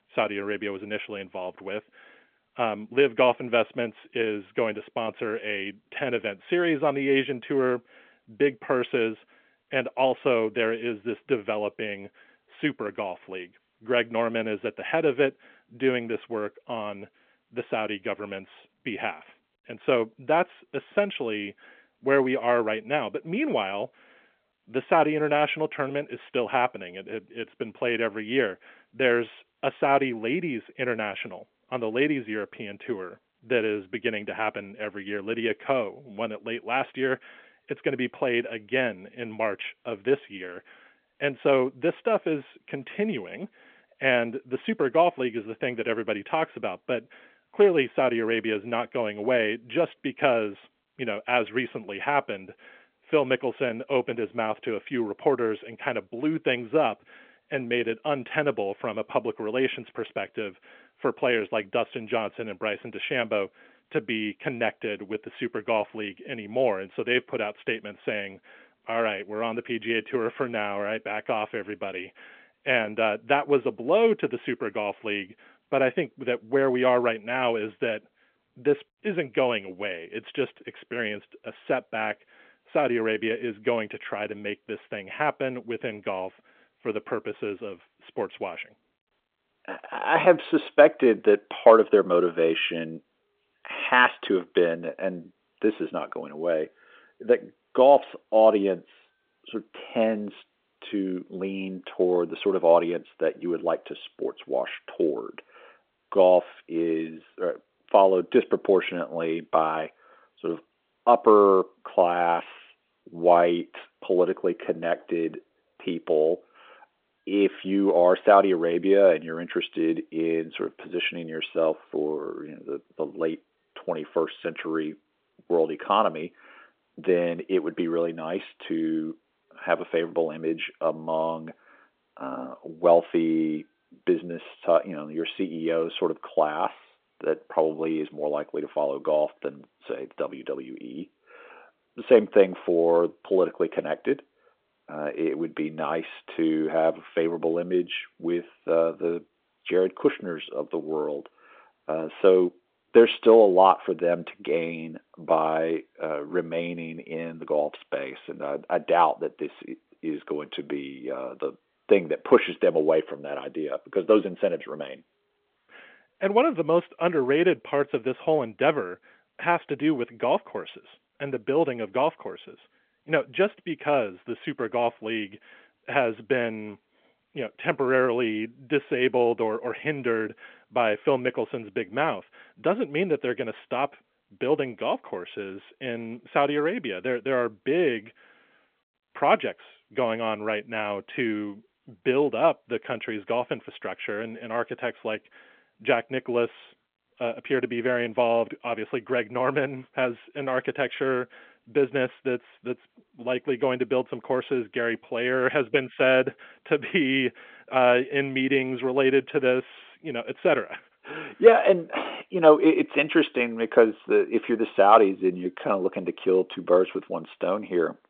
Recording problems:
phone-call audio

